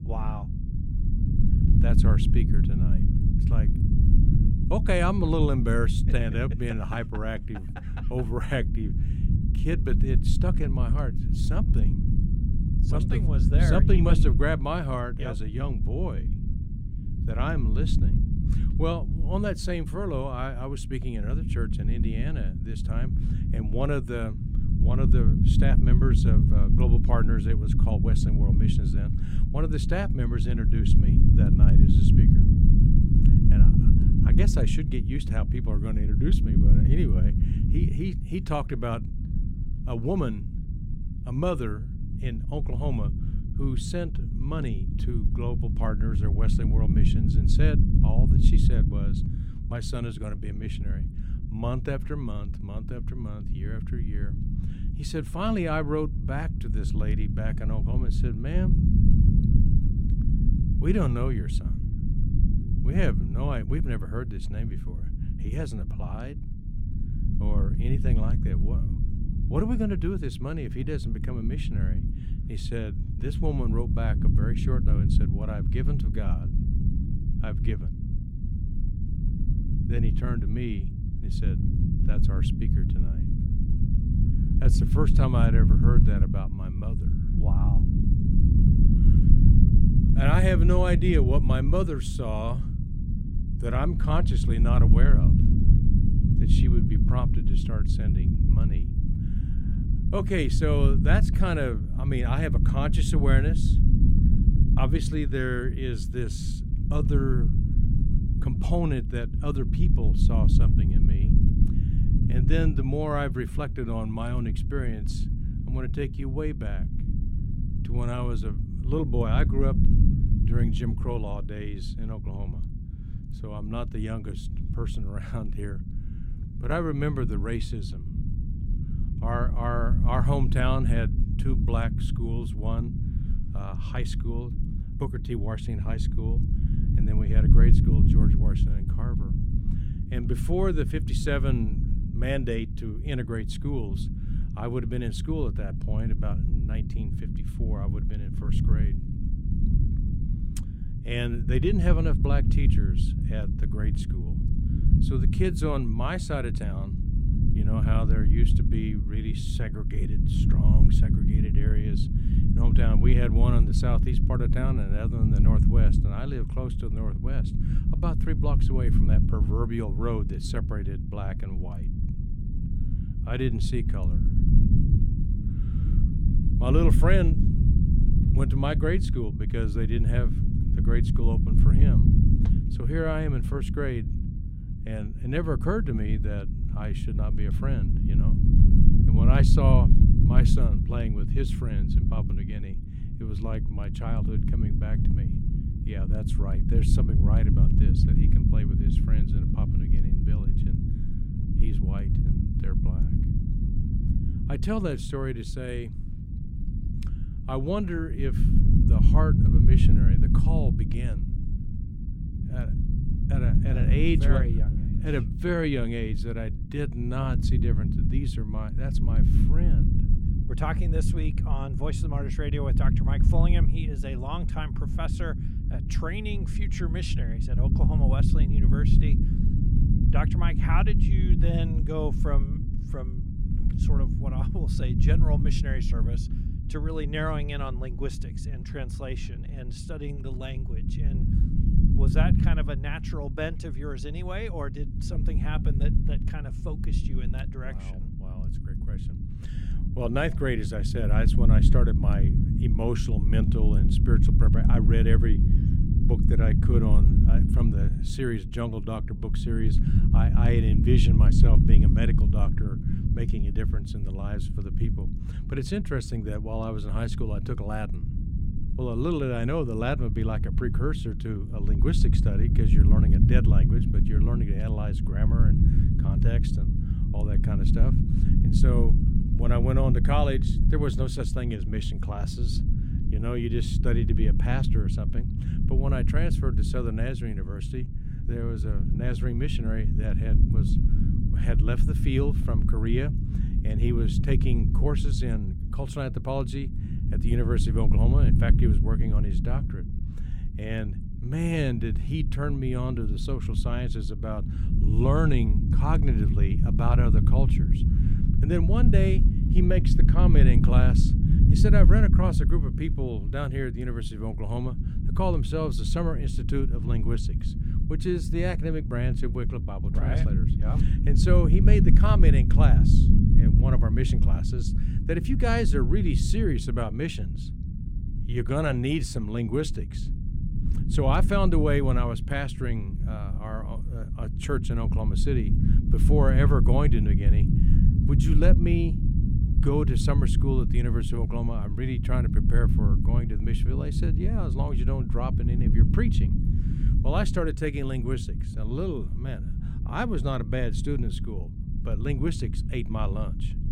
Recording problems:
low rumble; loud; throughout; 4 dB below the speech

